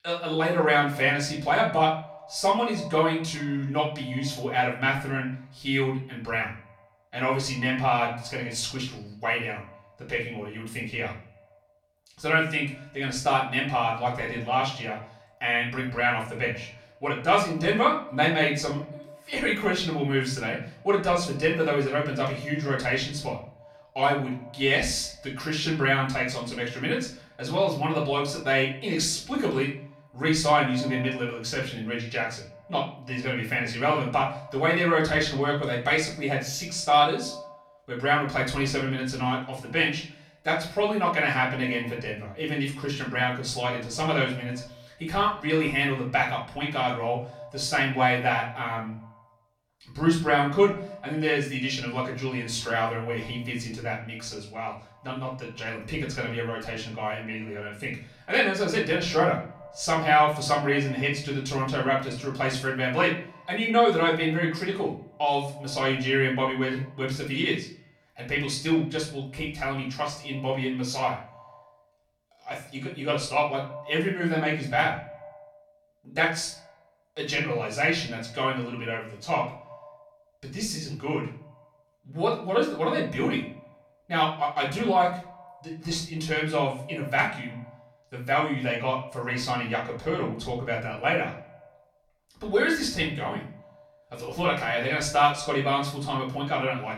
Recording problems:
off-mic speech; far
echo of what is said; faint; throughout; 100 ms later, 20 dB below the speech
room echo; slight; dies away in 0.4 s

